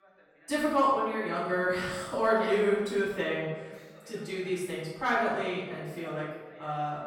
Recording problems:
off-mic speech; far
room echo; noticeable; dies away in 1 s
voice in the background; faint; throughout; 25 dB below the speech

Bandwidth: 17 kHz